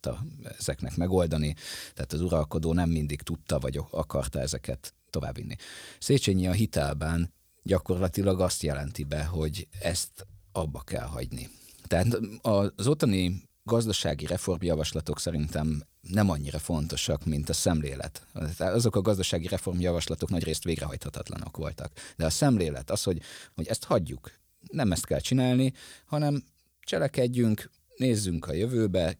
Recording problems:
uneven, jittery; strongly; from 5 to 29 s

